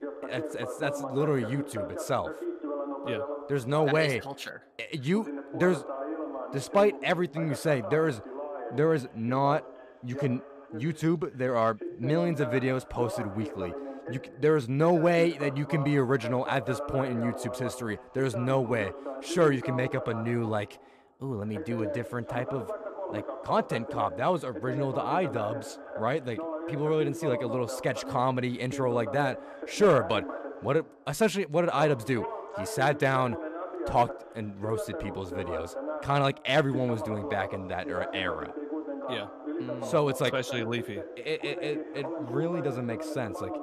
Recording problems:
voice in the background; loud; throughout; 8 dB below the speech

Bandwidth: 14.5 kHz